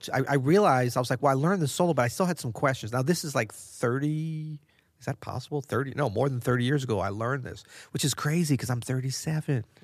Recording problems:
none

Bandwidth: 14.5 kHz